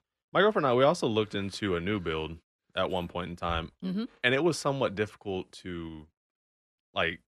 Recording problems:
none

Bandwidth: 13 kHz